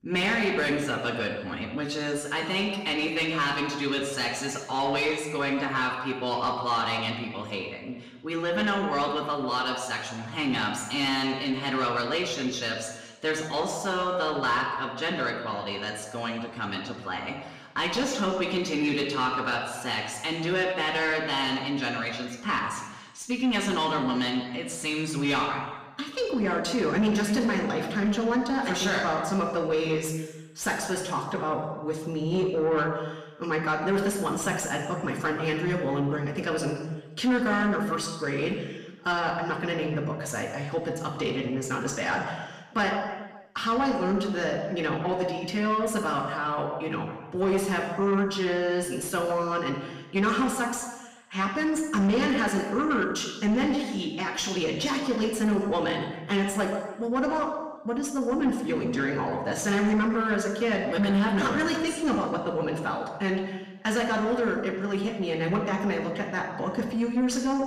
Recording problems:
room echo; noticeable; dies away in 1 s
distortion; slight; 10 dB below the speech
off-mic speech; somewhat distant

